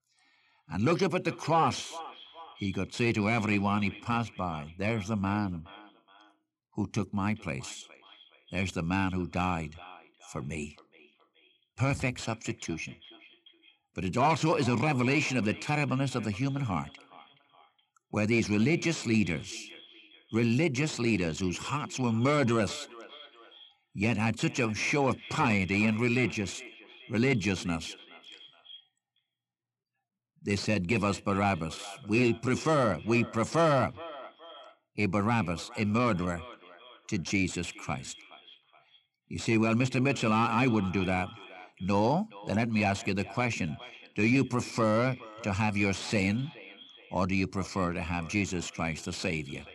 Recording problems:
echo of what is said; faint; throughout; 420 ms later, 20 dB below the speech

